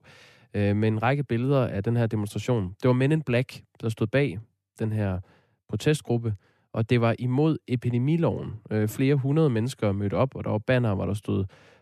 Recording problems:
none

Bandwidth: 13.5 kHz